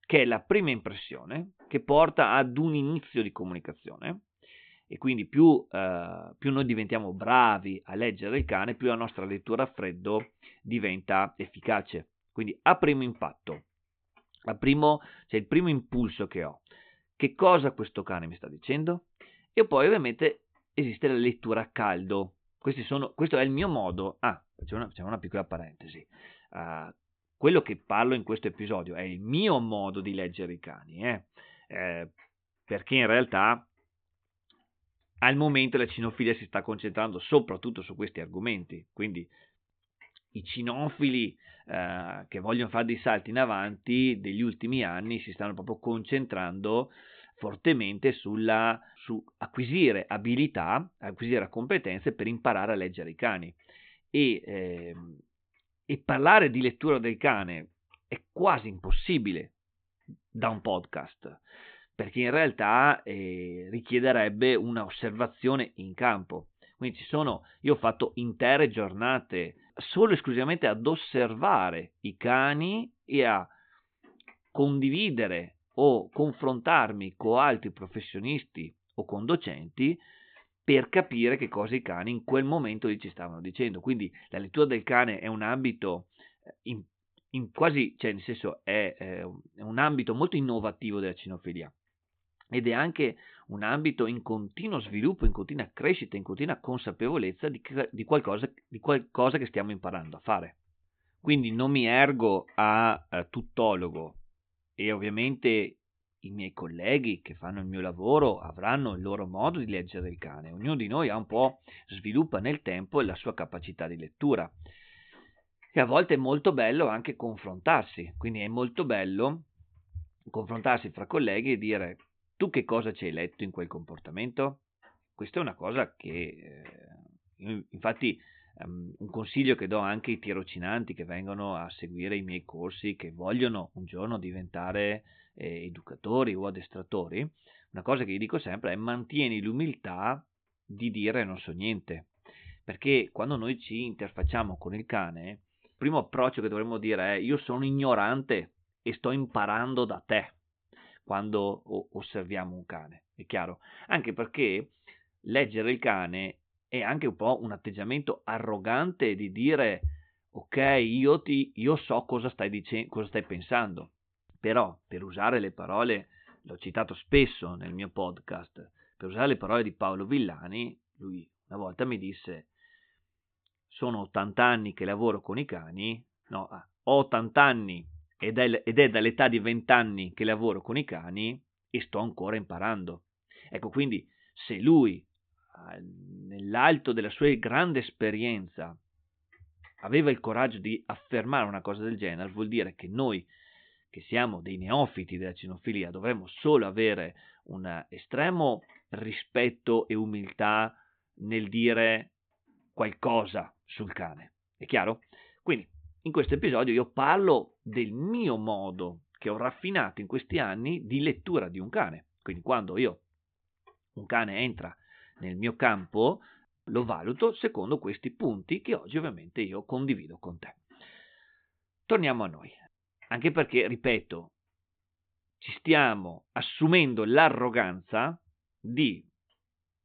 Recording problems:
high frequencies cut off; severe; nothing above 4 kHz

